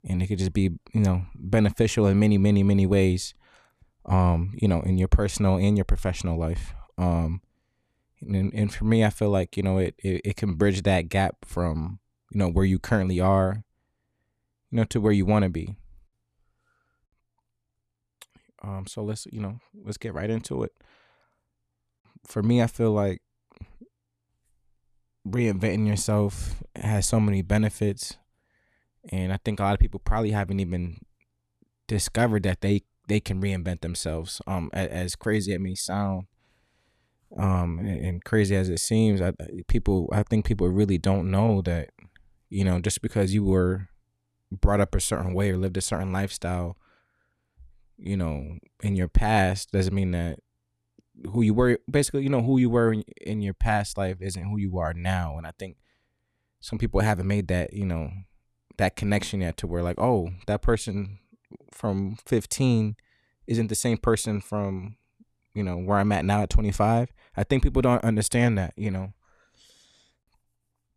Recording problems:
none

